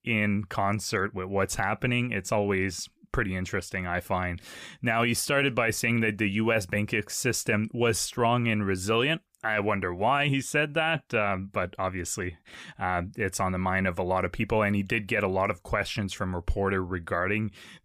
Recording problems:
none

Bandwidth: 15 kHz